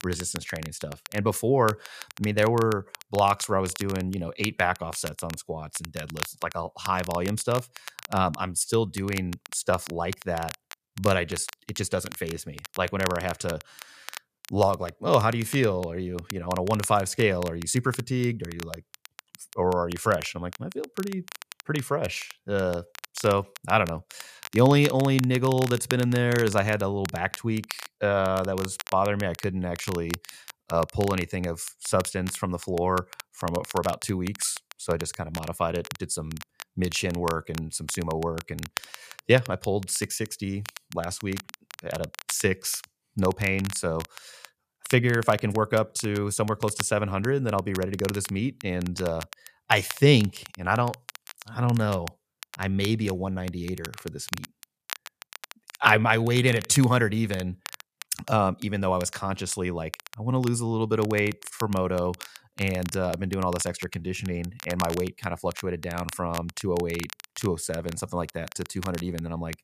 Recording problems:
crackle, like an old record; noticeable; 15 dB below the speech

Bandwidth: 14.5 kHz